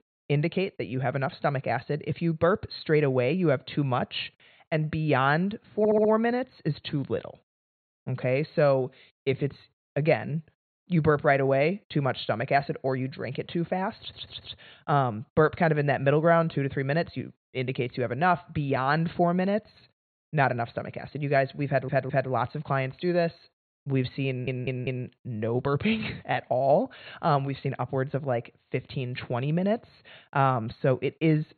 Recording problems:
high frequencies cut off; severe; nothing above 4.5 kHz
audio stuttering; 4 times, first at 6 s

